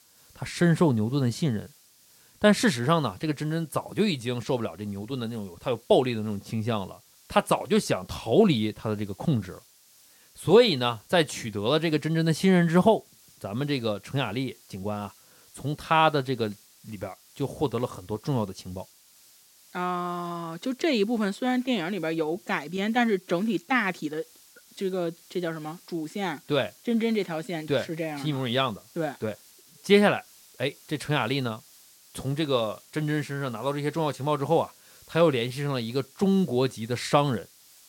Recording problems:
hiss; faint; throughout; 25 dB below the speech

